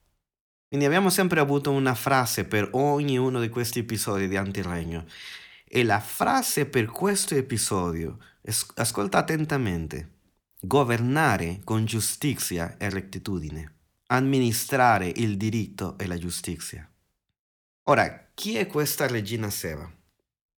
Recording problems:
none

